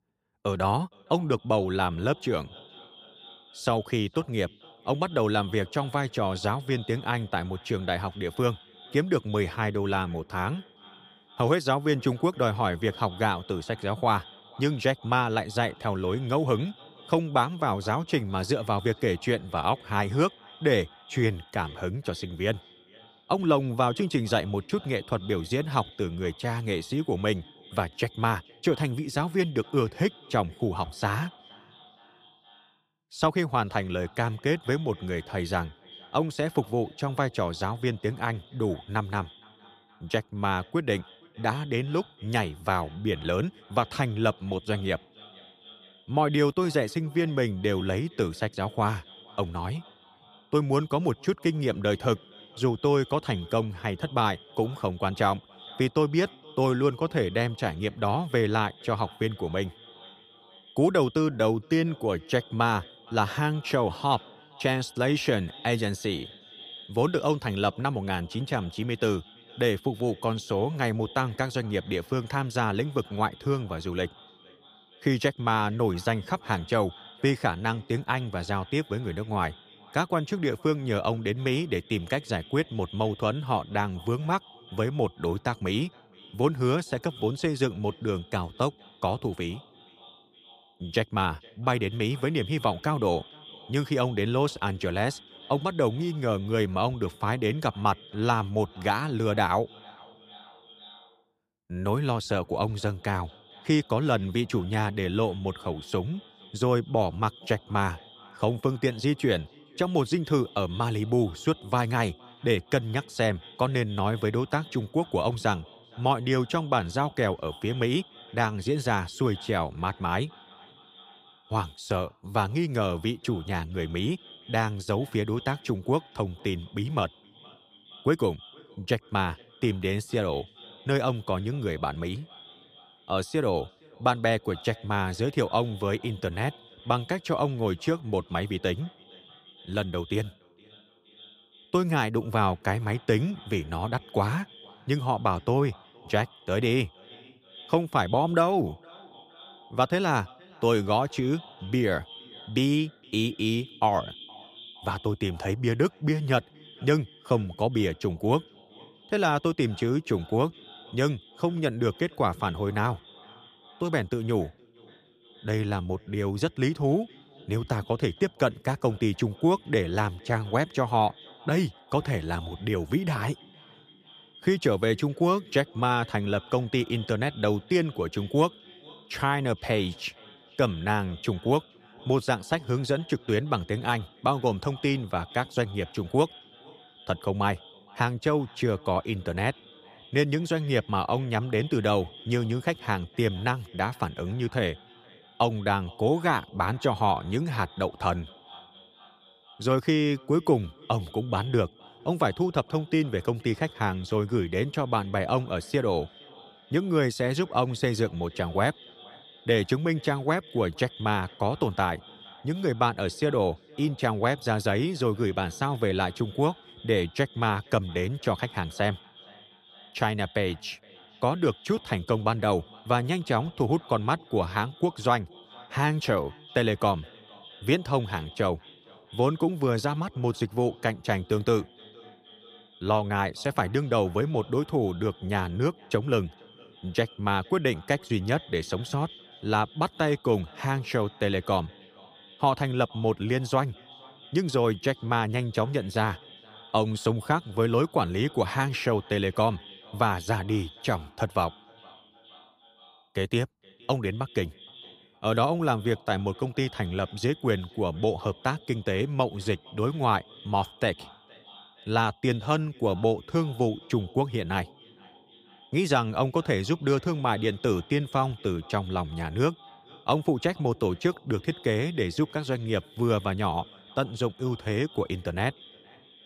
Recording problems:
echo of what is said; faint; throughout; 470 ms later, 20 dB below the speech

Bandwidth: 15 kHz